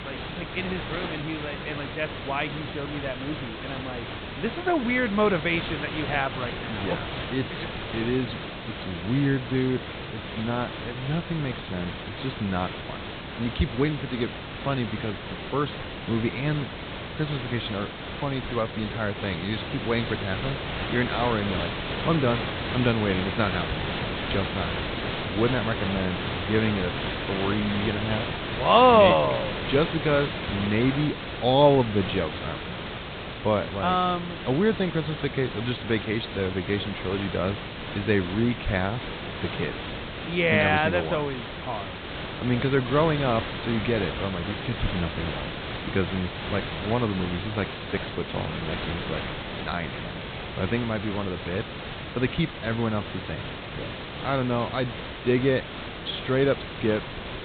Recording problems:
high frequencies cut off; severe; nothing above 4 kHz
hiss; loud; throughout; 6 dB below the speech

